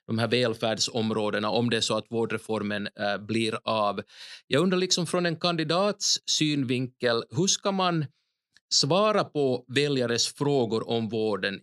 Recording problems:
none

